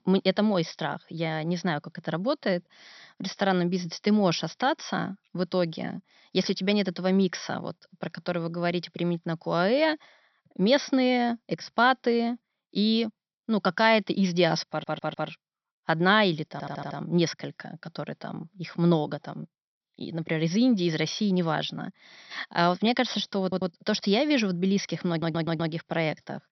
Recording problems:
high frequencies cut off; noticeable; nothing above 6 kHz
audio stuttering; 4 times, first at 15 s

